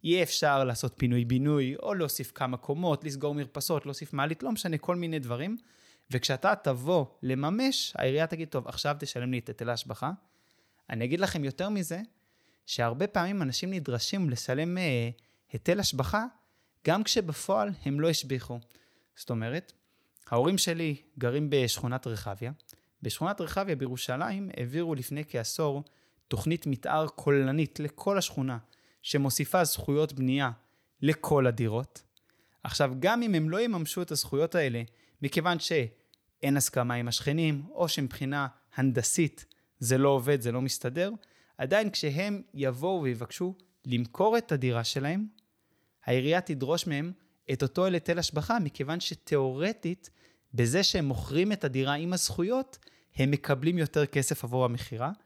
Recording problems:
none

